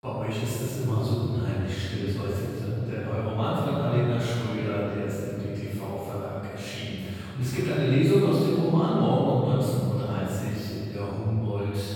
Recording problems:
room echo; strong; dies away in 2.4 s
off-mic speech; far

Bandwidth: 17.5 kHz